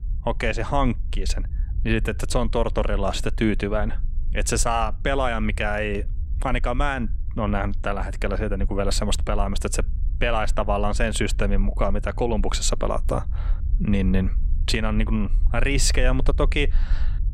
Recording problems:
low rumble; faint; throughout; 25 dB below the speech

